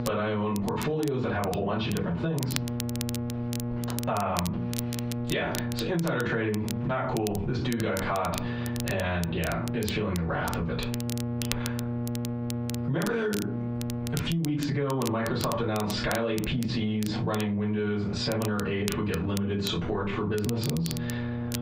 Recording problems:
off-mic speech; far
squashed, flat; heavily
room echo; slight; dies away in 0.3 s
muffled; very slightly; fading above 4 kHz
electrical hum; noticeable; throughout; 60 Hz, 10 dB below the speech
crackle, like an old record; noticeable; 10 dB below the speech

